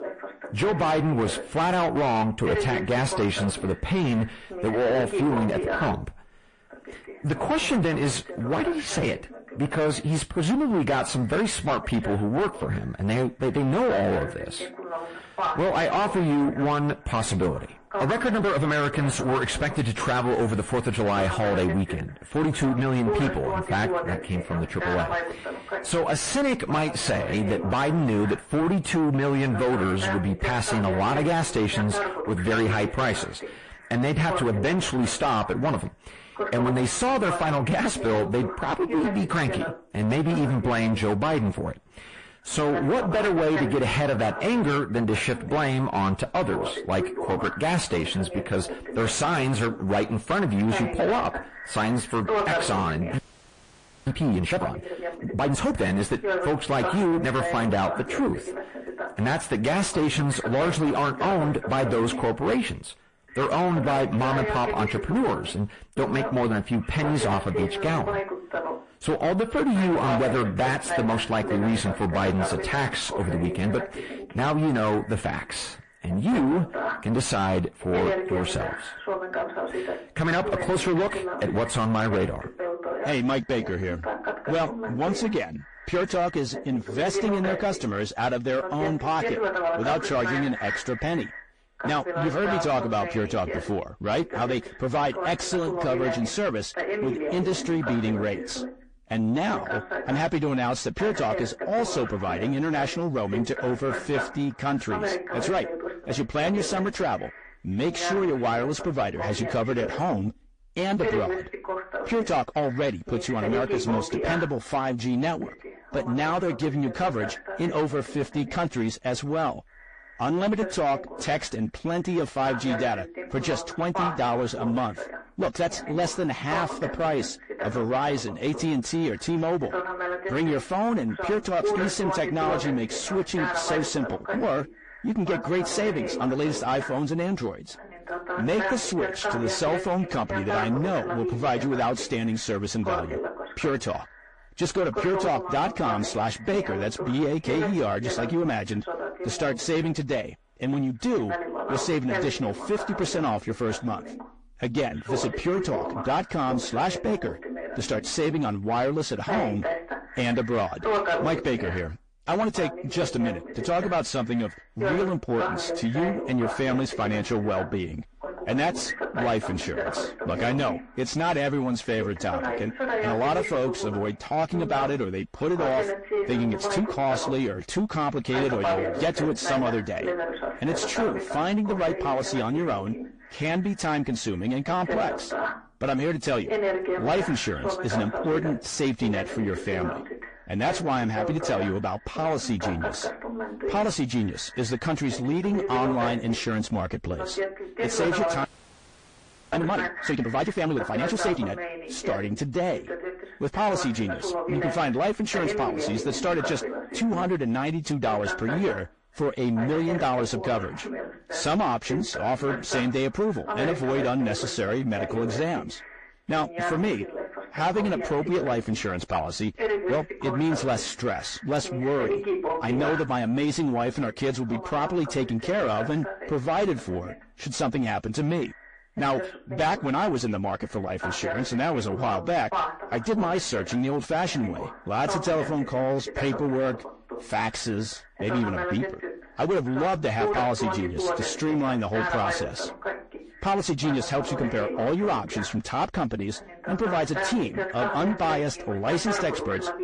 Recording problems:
distortion; heavy; 6 dB below the speech
garbled, watery; slightly; nothing above 8.5 kHz
voice in the background; loud; throughout; 6 dB below the speech
audio freezing; at 53 s for 1 s and at 3:18 for 1 s

